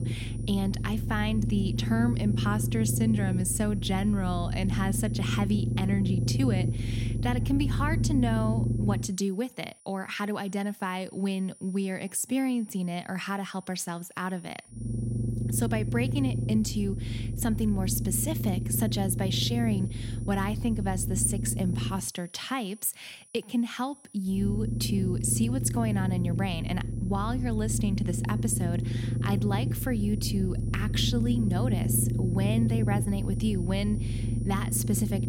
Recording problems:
low rumble; loud; until 9 s, from 15 to 22 s and from 24 s on; 7 dB below the speech
high-pitched whine; faint; throughout; 9.5 kHz, 25 dB below the speech

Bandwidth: 16.5 kHz